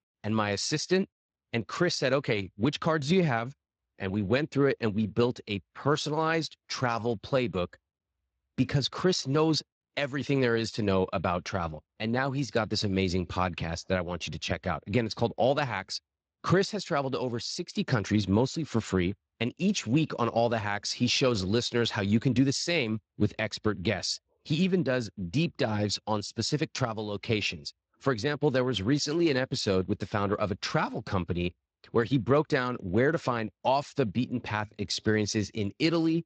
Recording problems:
garbled, watery; slightly; nothing above 7.5 kHz

